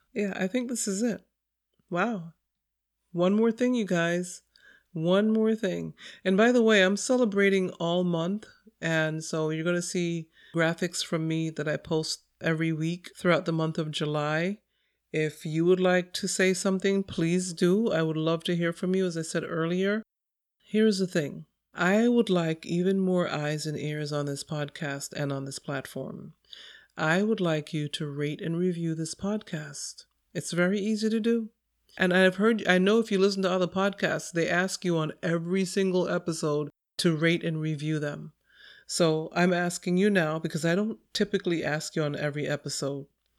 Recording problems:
none

